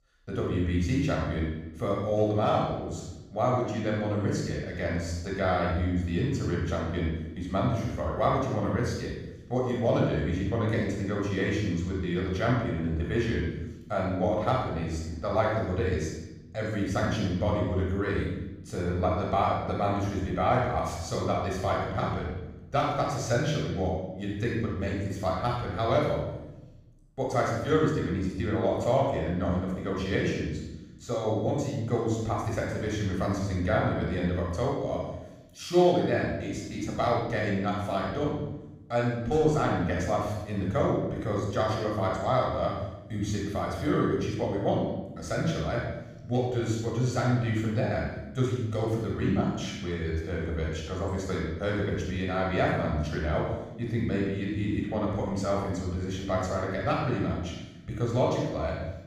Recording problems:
room echo; strong; dies away in 0.9 s
off-mic speech; far

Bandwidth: 15.5 kHz